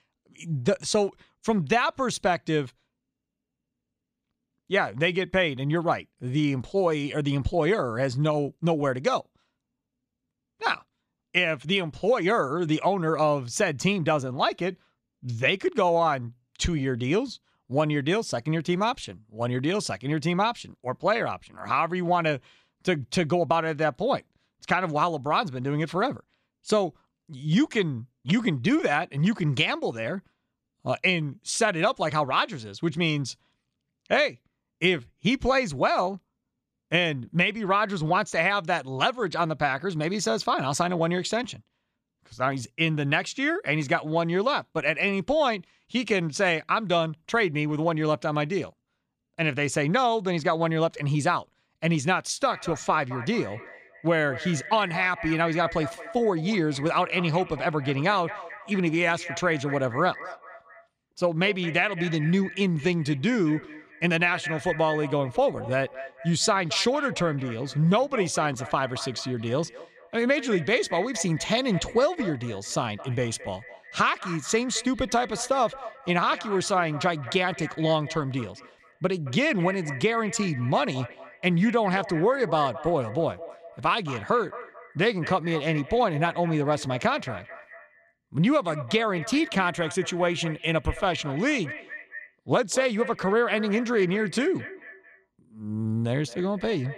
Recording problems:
echo of what is said; noticeable; from 52 s on; 220 ms later, 15 dB below the speech

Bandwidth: 15 kHz